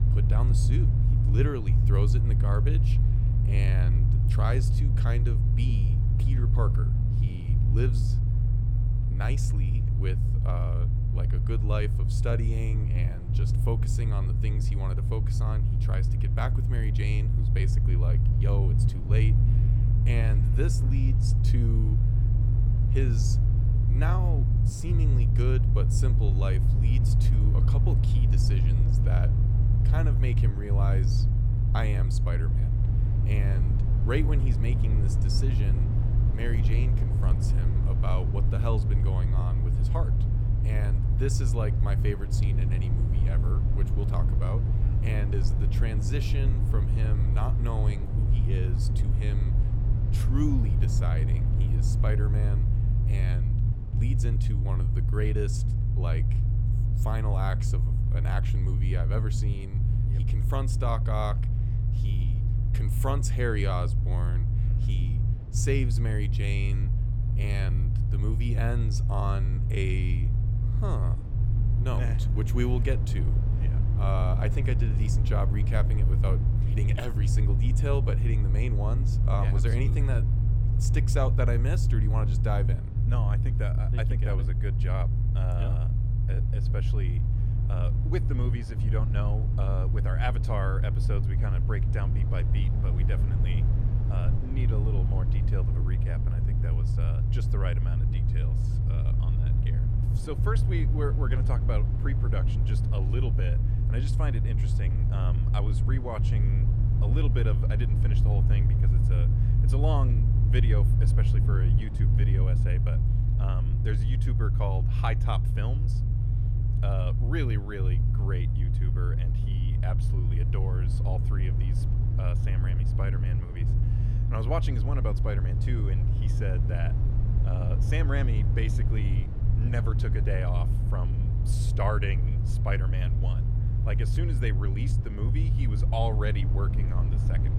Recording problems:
low rumble; loud; throughout; 2 dB below the speech

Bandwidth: 17.5 kHz